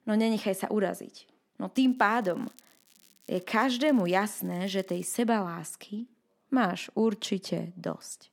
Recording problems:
crackling; faint; from 2 to 5 s; 30 dB below the speech

